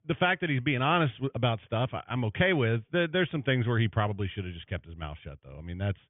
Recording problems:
high frequencies cut off; severe; nothing above 3.5 kHz

